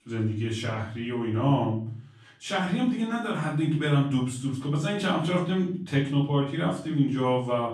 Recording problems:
off-mic speech; far
room echo; slight; dies away in 0.5 s

